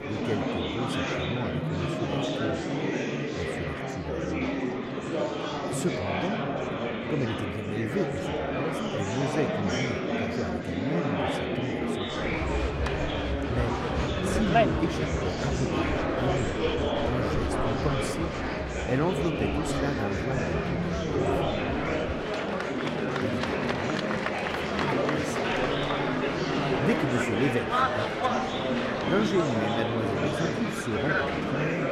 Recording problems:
murmuring crowd; very loud; throughout; 5 dB above the speech

